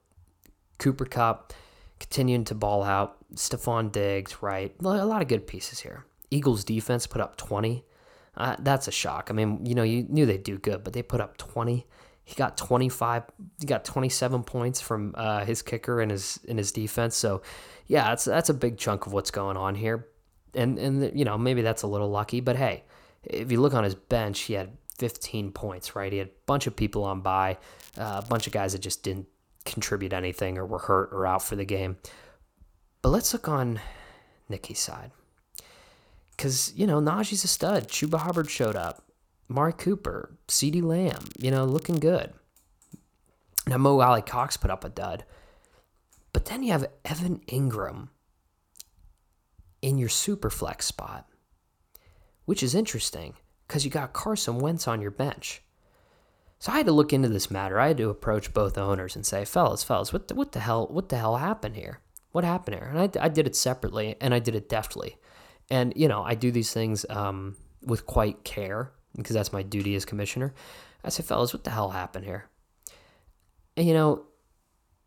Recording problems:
crackling; noticeable; at 28 s, from 38 to 39 s and at 41 s; 20 dB below the speech

